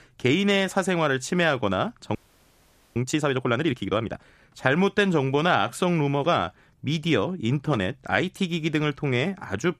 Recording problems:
audio freezing; at 2 s for 1 s

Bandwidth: 14.5 kHz